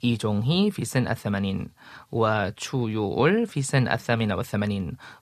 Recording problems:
none

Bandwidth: 14 kHz